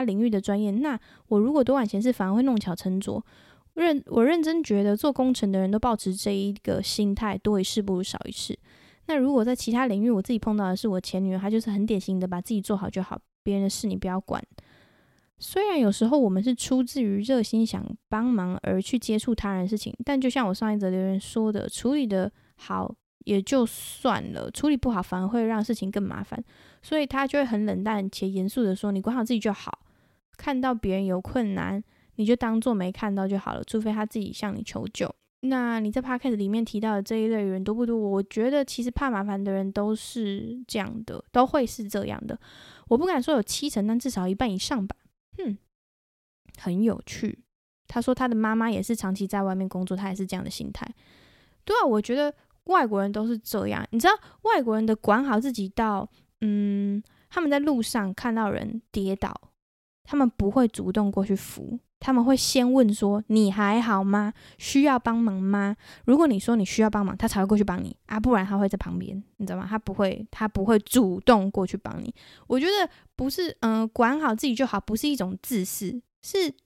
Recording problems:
abrupt cut into speech; at the start

